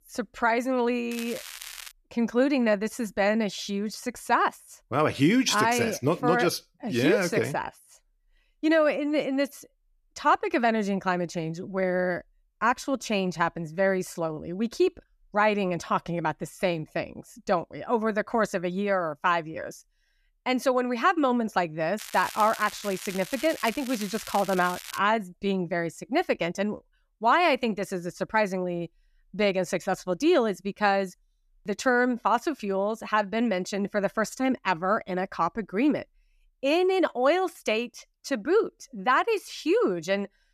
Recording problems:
crackling; noticeable; at 1 s and from 22 to 25 s; 15 dB below the speech

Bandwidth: 14.5 kHz